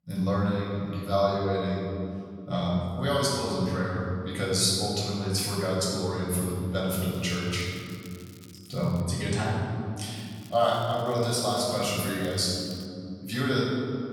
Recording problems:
room echo; strong; dies away in 2.9 s
off-mic speech; far
crackling; faint; from 7 to 9 s and from 10 to 13 s; 25 dB below the speech

